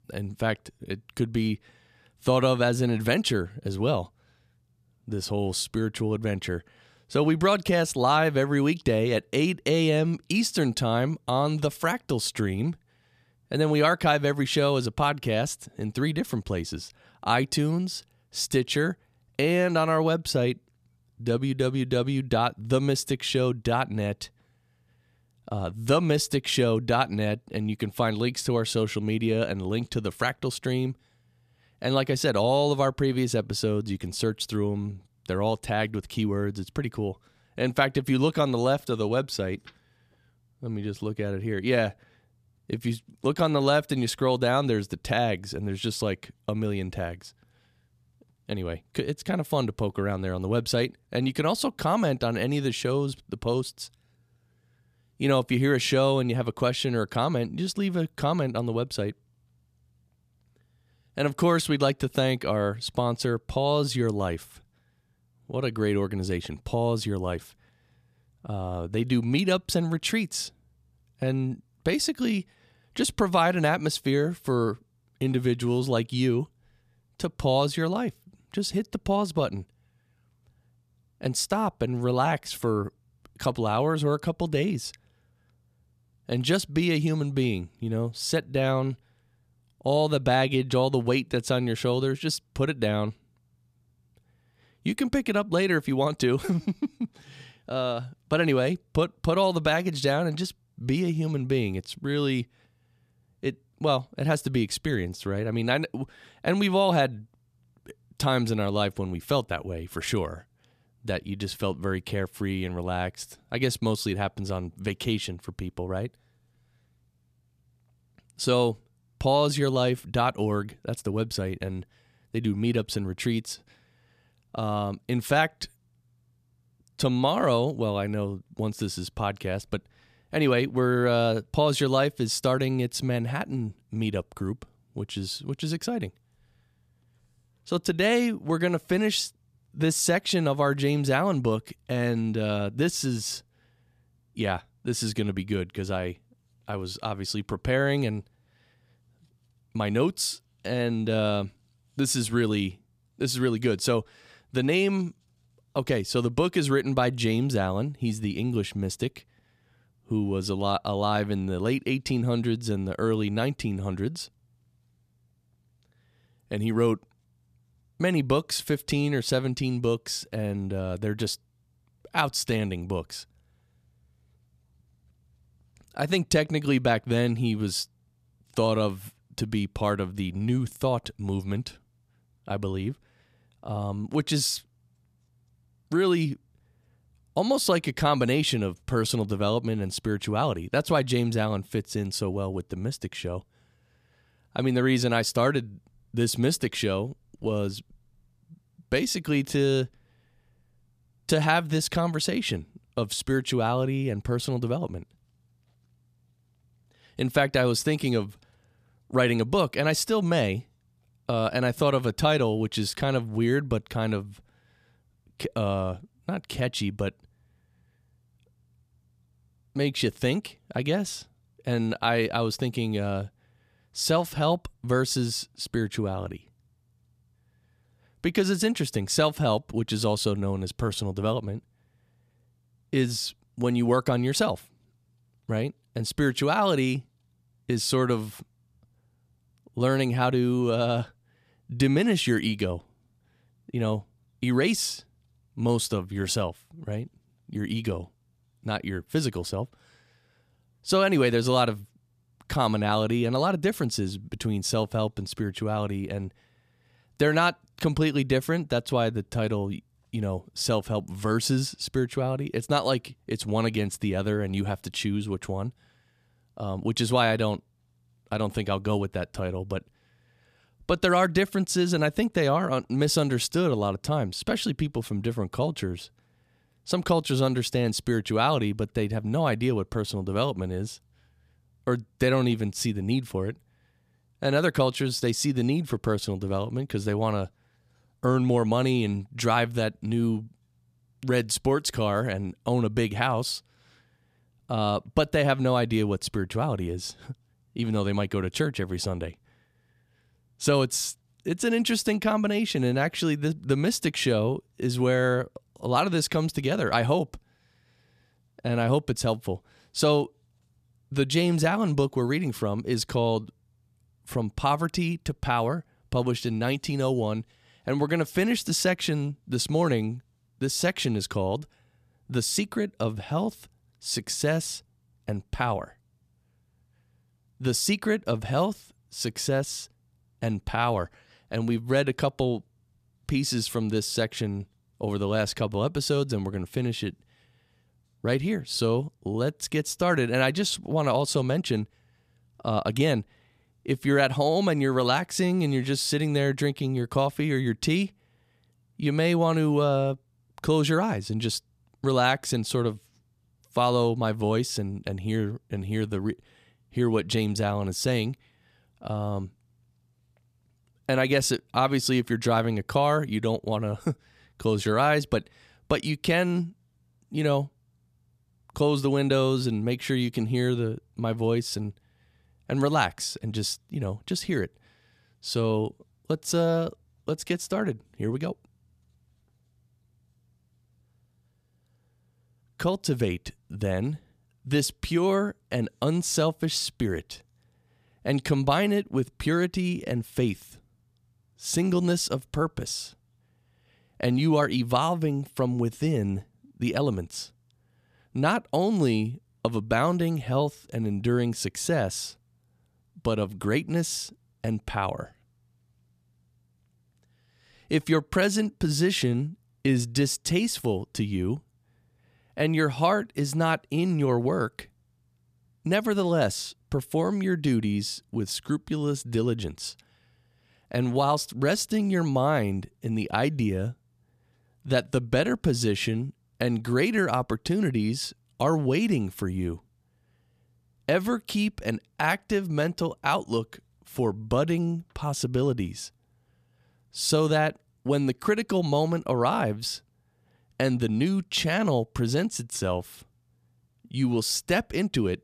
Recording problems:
none

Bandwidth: 14.5 kHz